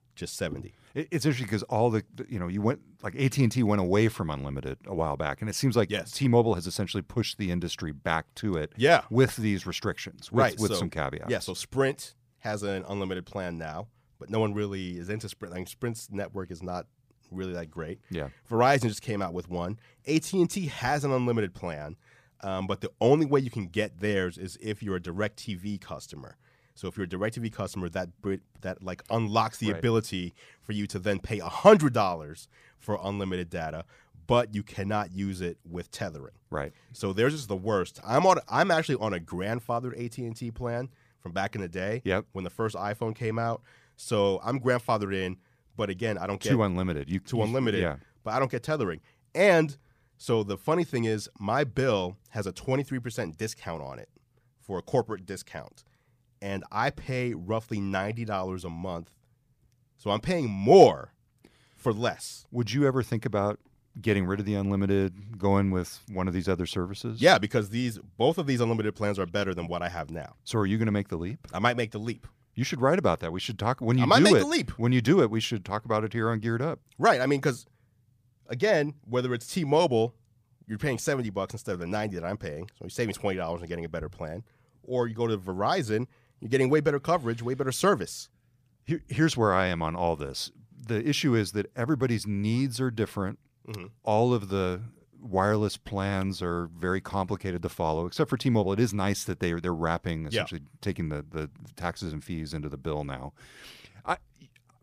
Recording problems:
none

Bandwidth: 15 kHz